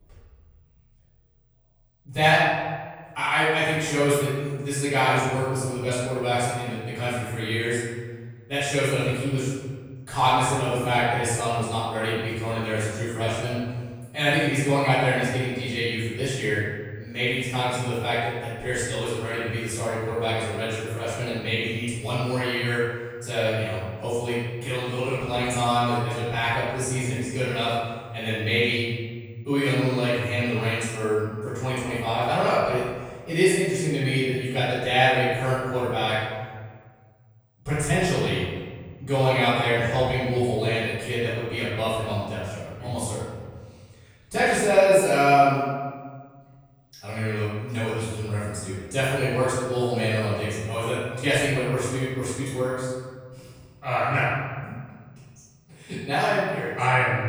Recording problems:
room echo; strong; dies away in 1.5 s
off-mic speech; far

